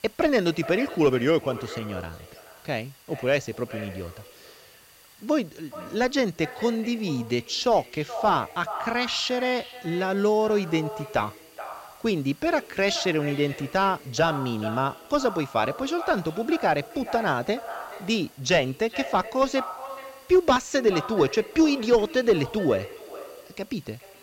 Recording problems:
echo of what is said; noticeable; throughout; 430 ms later, 15 dB below the speech
high frequencies cut off; noticeable; nothing above 8 kHz
hiss; faint; throughout; 25 dB below the speech

